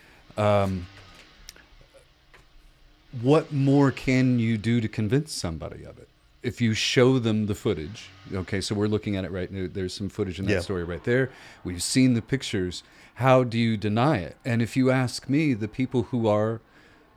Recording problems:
traffic noise; faint; throughout; 30 dB below the speech

